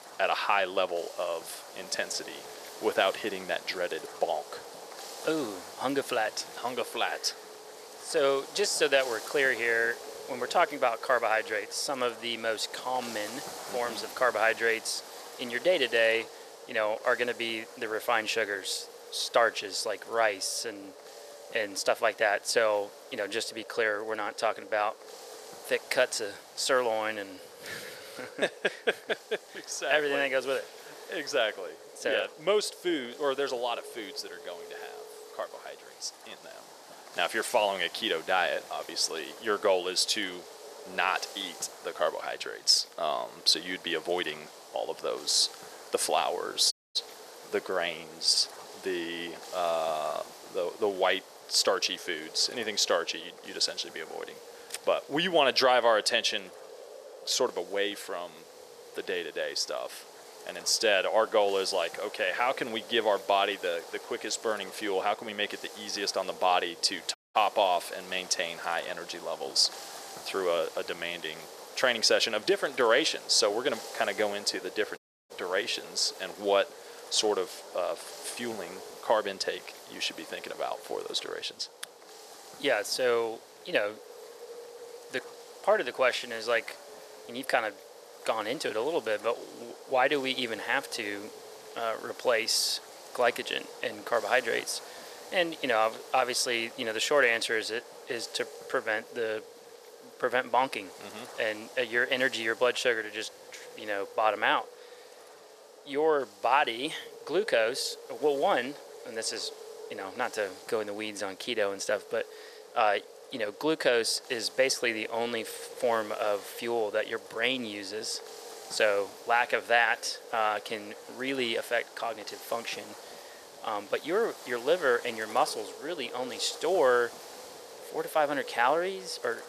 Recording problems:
thin; somewhat; fading below 500 Hz
echo of what is said; faint; throughout; 300 ms later, 20 dB below the speech
wind noise on the microphone; occasional gusts; 20 dB below the speech
audio cutting out; at 47 s, at 1:07 and at 1:15

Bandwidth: 14.5 kHz